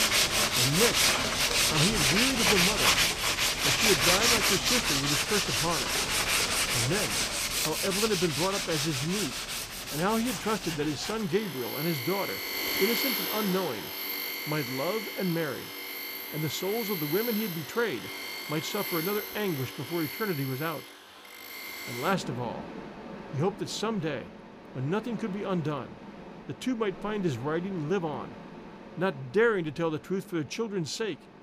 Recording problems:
machinery noise; very loud; throughout; 4 dB above the speech

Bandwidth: 15 kHz